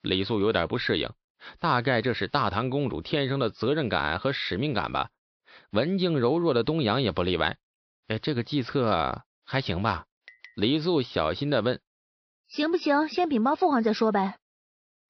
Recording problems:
high frequencies cut off; noticeable; nothing above 5.5 kHz

